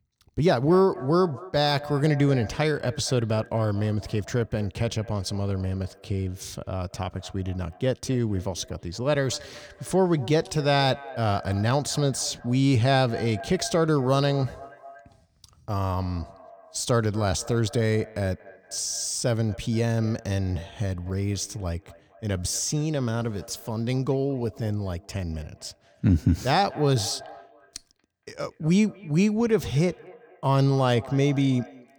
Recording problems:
echo of what is said; faint; throughout; 230 ms later, 20 dB below the speech

